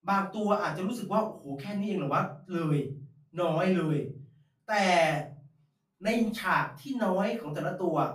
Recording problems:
off-mic speech; far
room echo; slight; dies away in 0.4 s

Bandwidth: 15 kHz